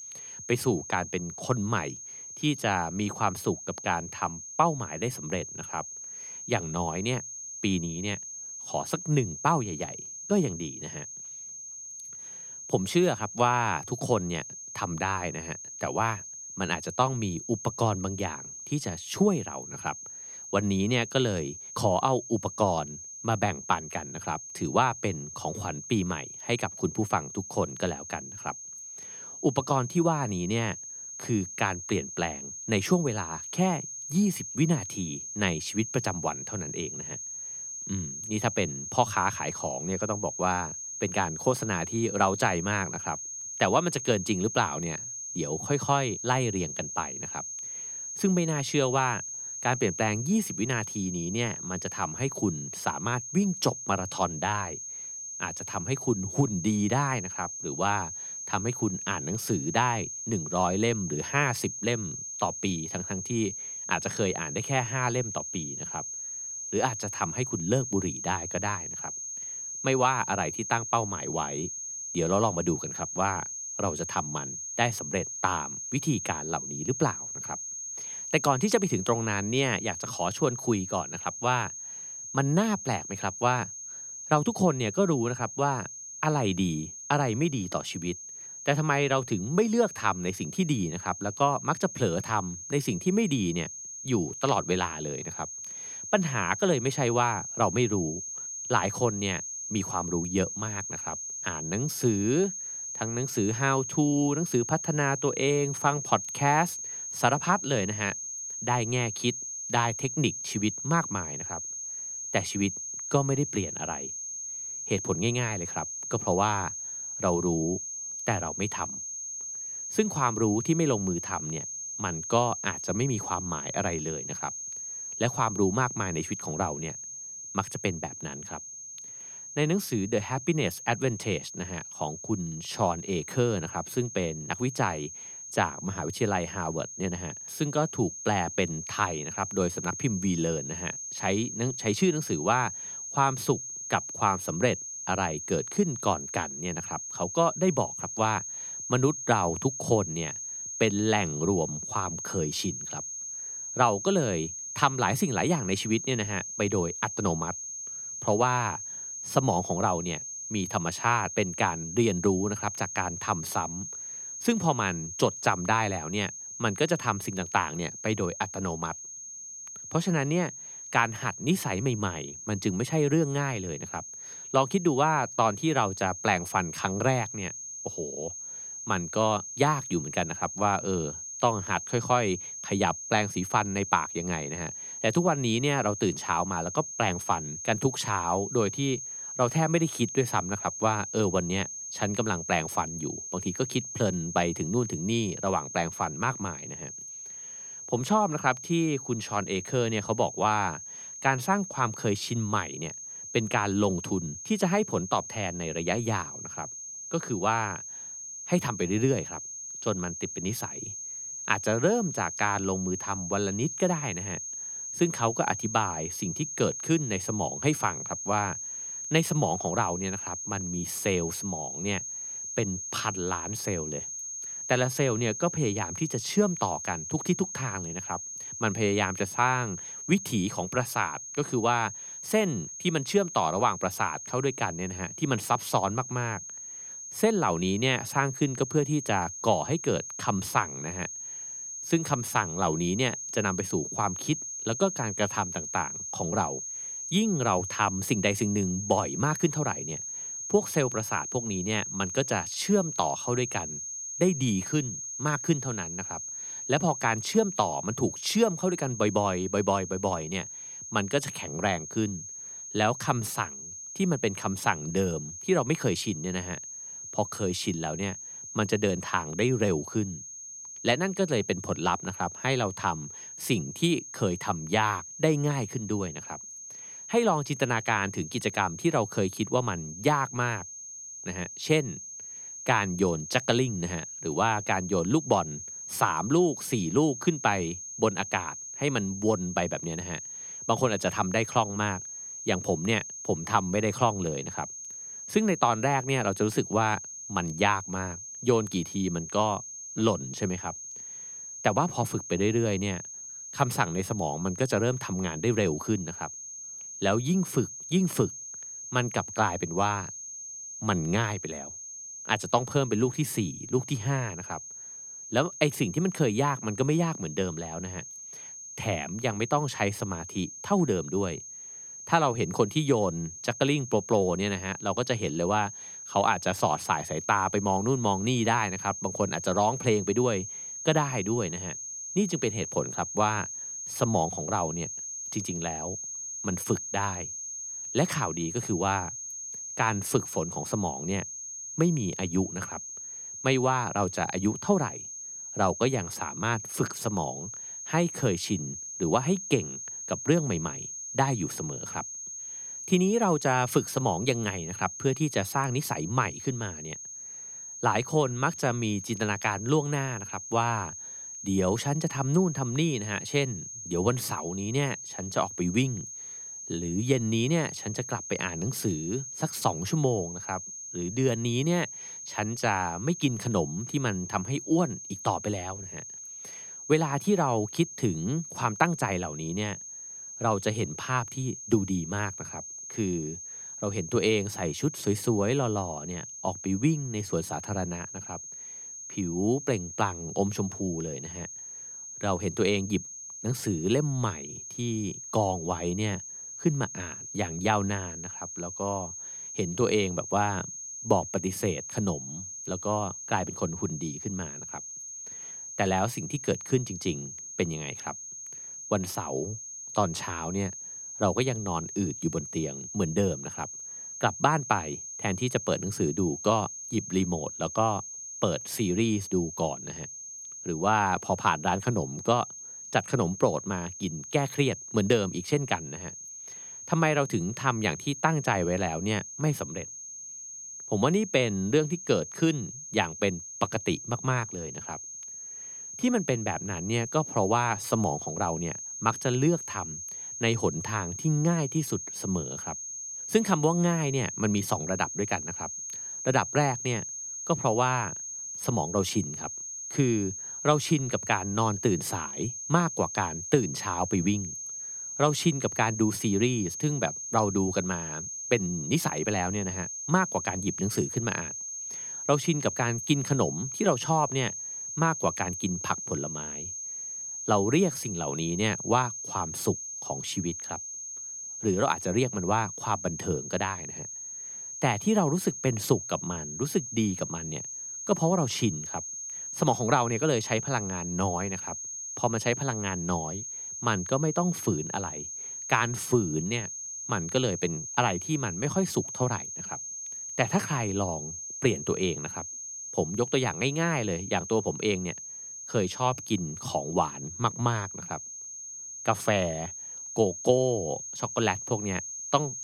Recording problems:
high-pitched whine; loud; throughout; 6.5 kHz, 7 dB below the speech

